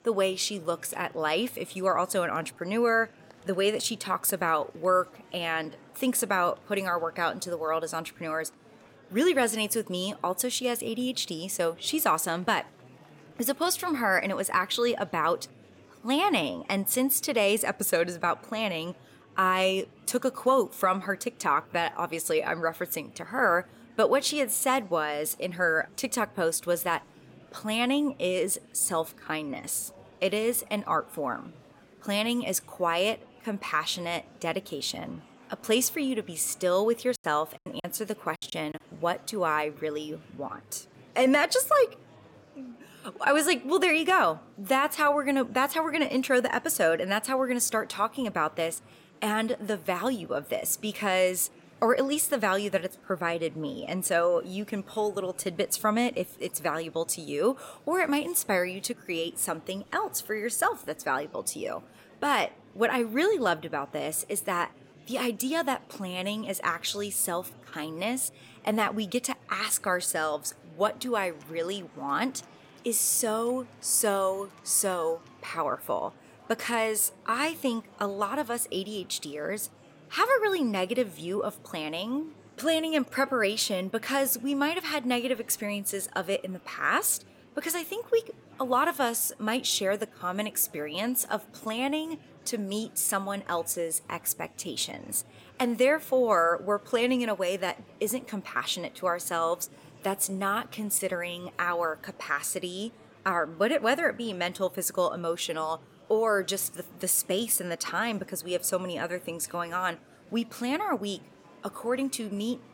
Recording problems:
murmuring crowd; faint; throughout; 25 dB below the speech
choppy; very; from 37 to 39 s; 20% of the speech affected

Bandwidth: 16.5 kHz